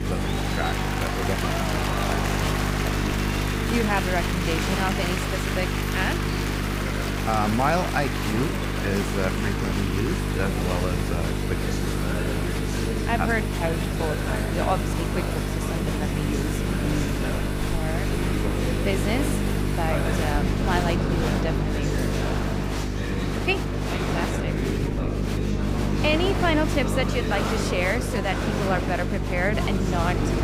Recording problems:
electrical hum; loud; throughout; 50 Hz, 7 dB below the speech
crowd noise; loud; throughout; 6 dB below the speech
rain or running water; loud; throughout; 5 dB below the speech
background chatter; loud; throughout; 3 voices, 5 dB below the speech

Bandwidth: 15.5 kHz